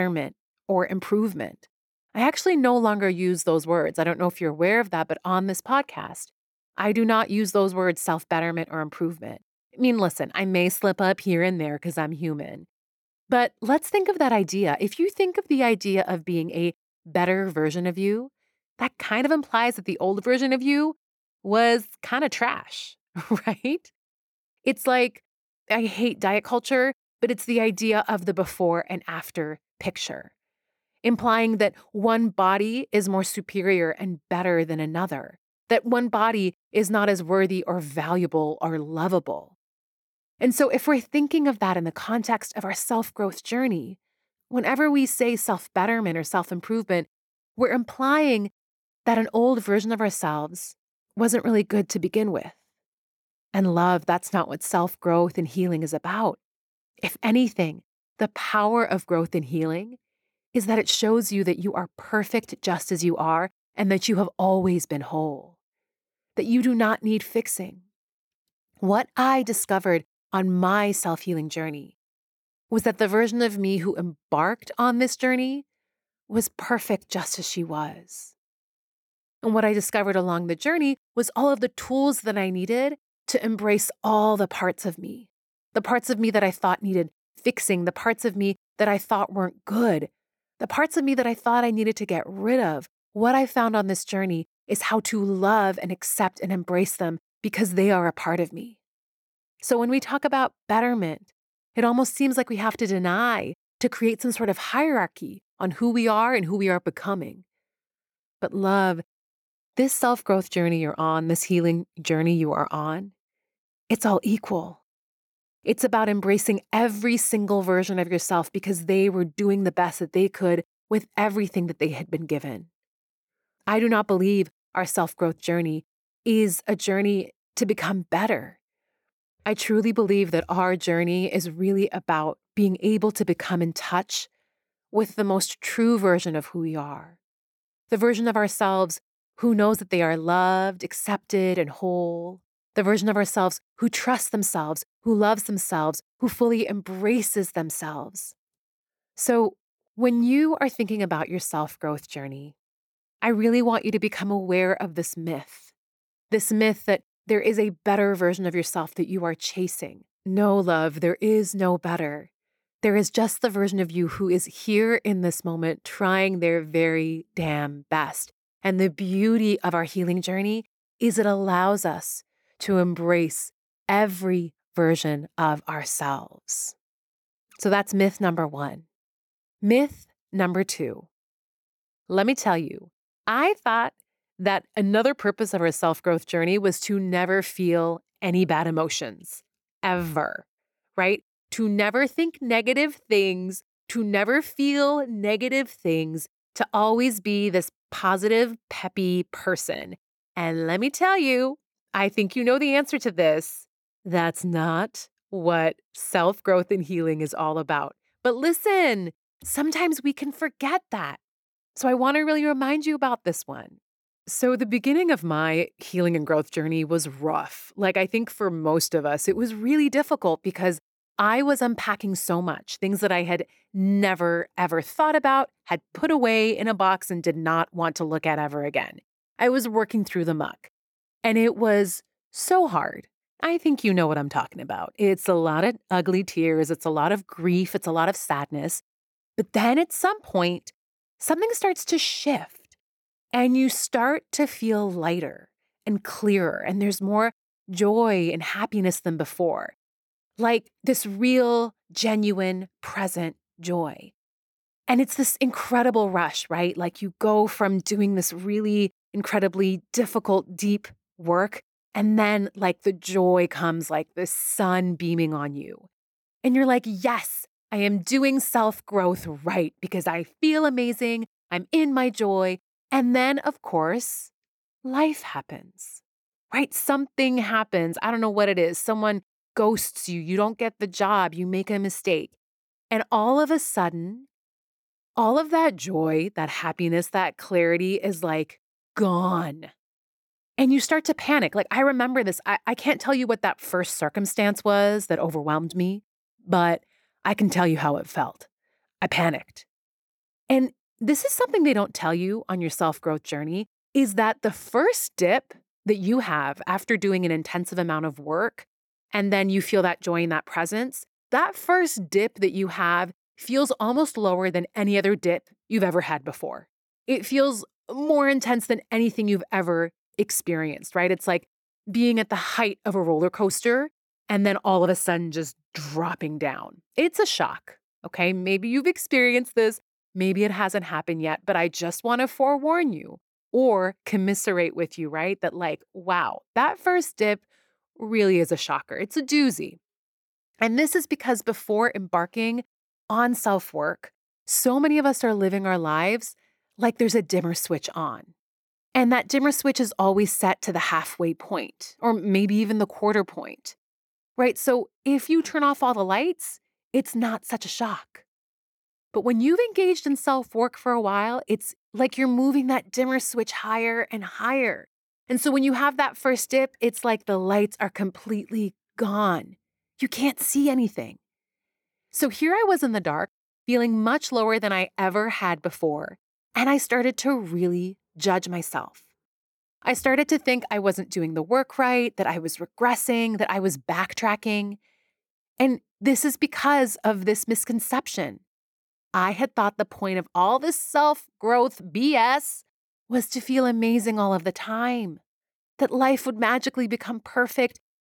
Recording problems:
abrupt cut into speech; at the start

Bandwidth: 18.5 kHz